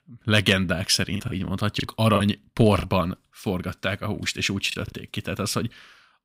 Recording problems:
choppy; occasionally; 5% of the speech affected

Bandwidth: 15.5 kHz